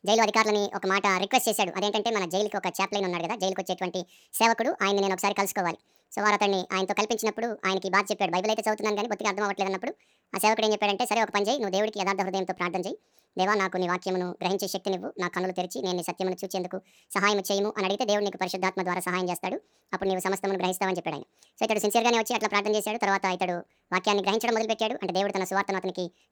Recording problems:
wrong speed and pitch; too fast and too high; 1.7 times normal speed

